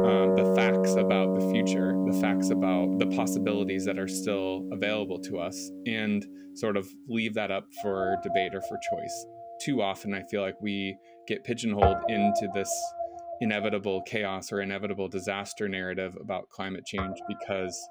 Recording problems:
background music; very loud; throughout; 3 dB above the speech

